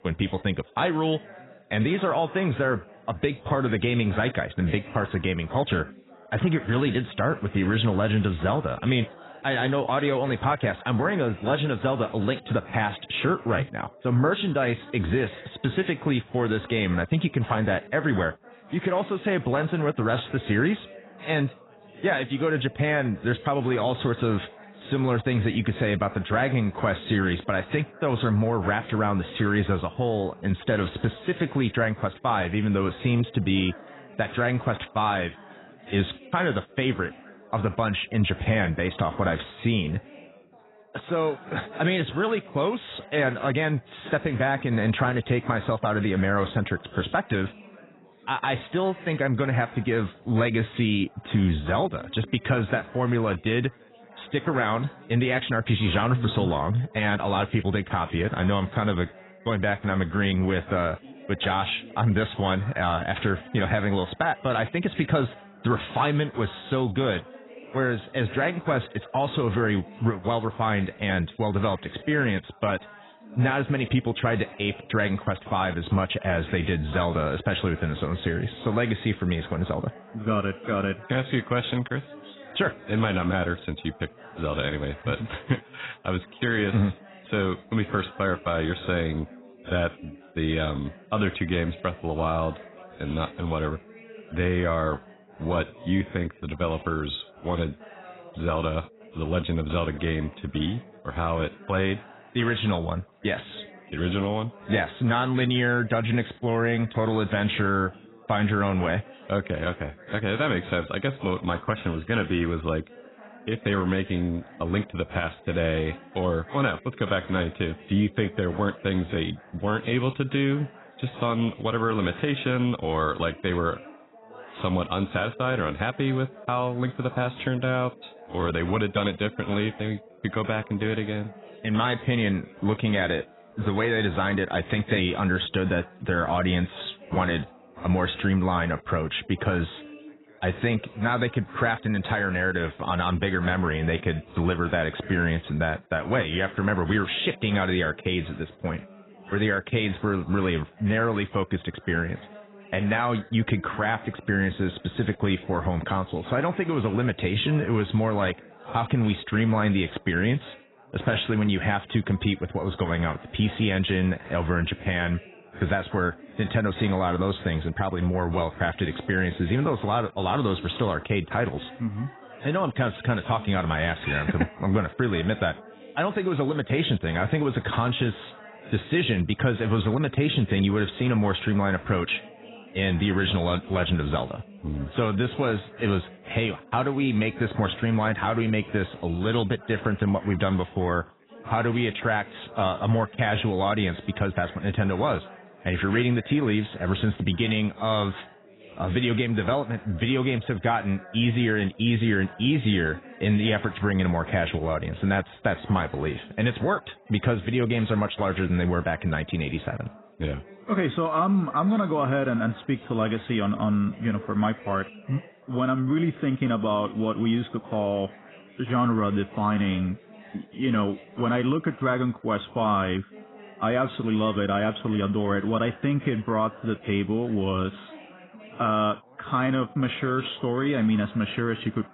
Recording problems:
garbled, watery; badly; nothing above 4 kHz
background chatter; faint; throughout; 3 voices, 20 dB below the speech

